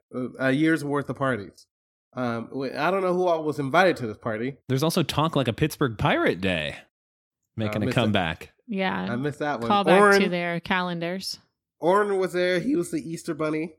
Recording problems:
none

